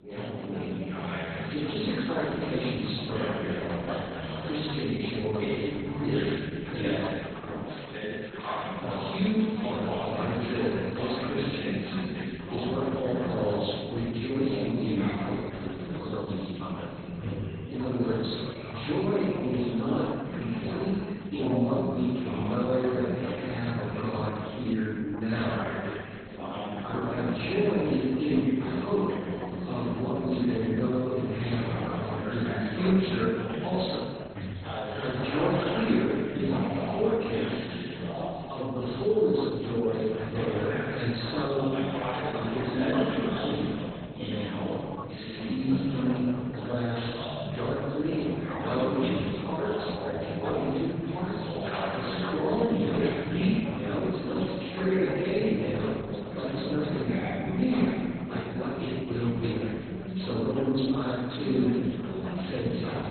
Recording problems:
room echo; strong; dies away in 1.6 s
off-mic speech; far
garbled, watery; badly; nothing above 4 kHz
background chatter; loud; throughout; 3 voices, 5 dB below the speech

